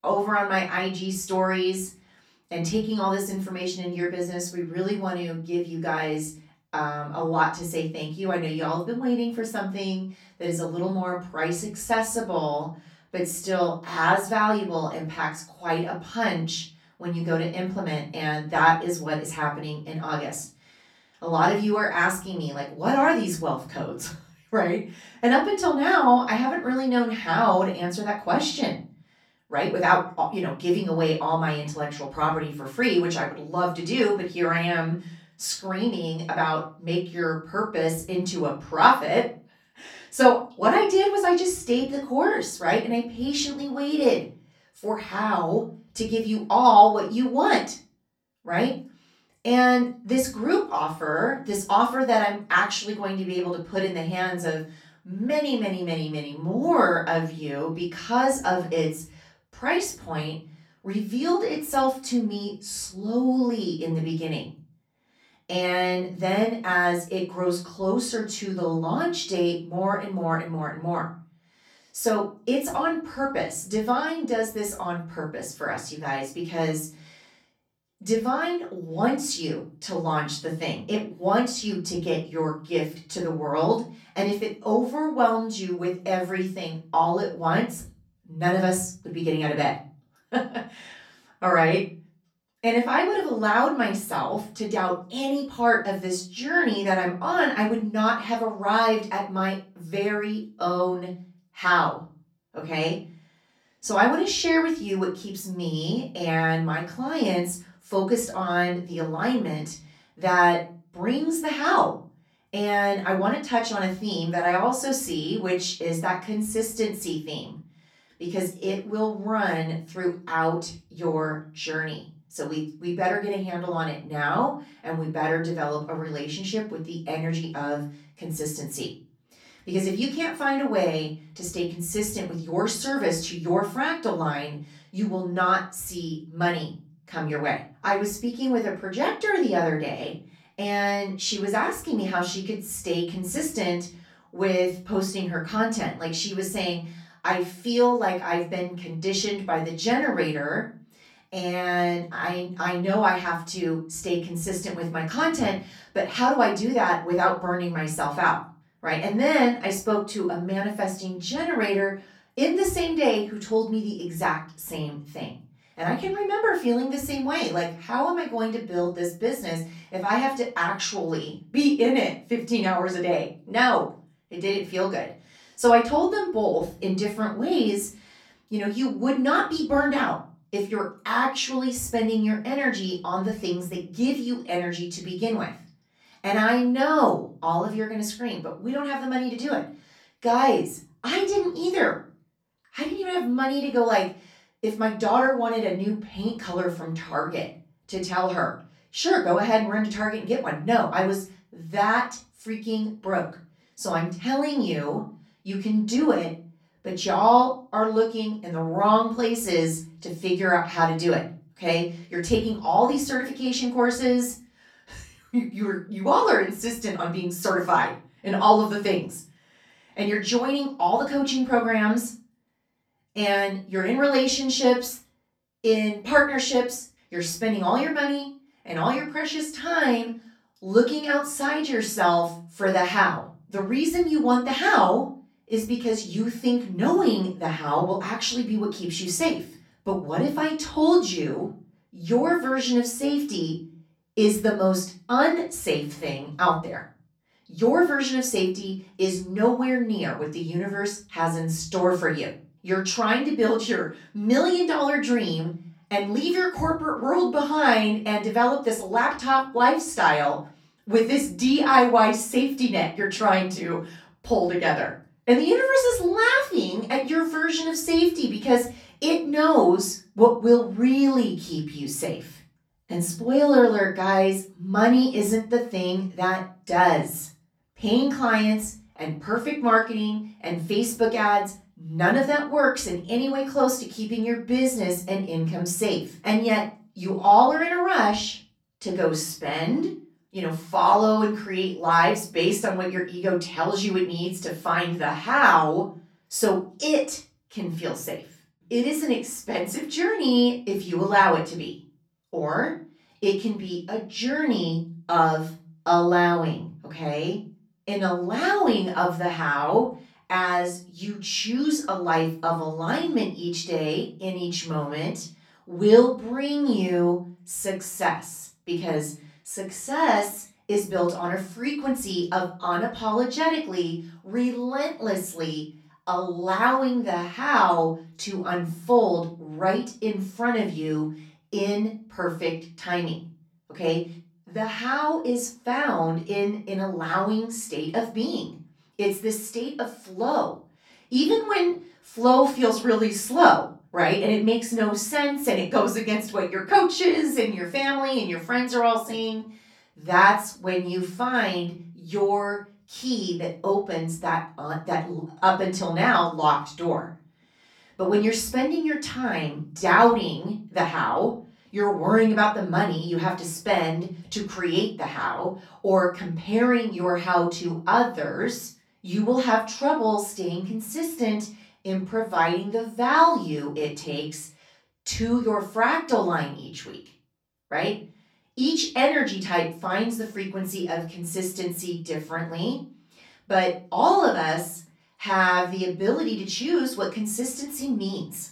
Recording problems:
off-mic speech; far
room echo; slight; dies away in 0.3 s

